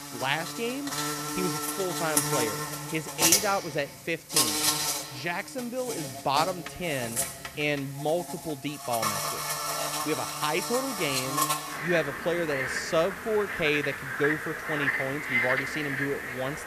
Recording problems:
animal sounds; very loud; throughout; 2 dB above the speech
hiss; noticeable; throughout; 15 dB below the speech

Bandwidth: 14.5 kHz